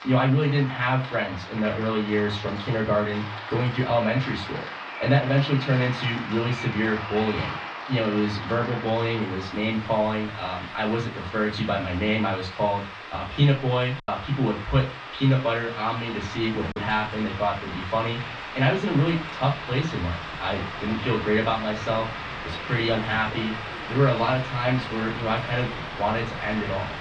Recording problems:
off-mic speech; far
muffled; slightly; fading above 4 kHz
room echo; very slight; dies away in 0.3 s
rain or running water; loud; throughout; 9 dB below the speech
train or aircraft noise; noticeable; throughout; 15 dB below the speech
choppy; occasionally; from 14 to 17 s; 2% of the speech affected

